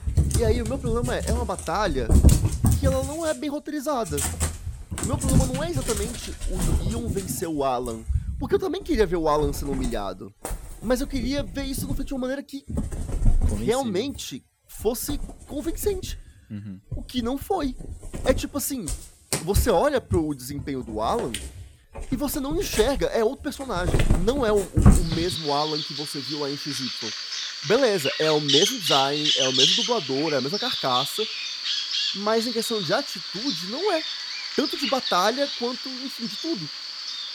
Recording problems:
animal sounds; very loud; throughout; 1 dB above the speech

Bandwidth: 19 kHz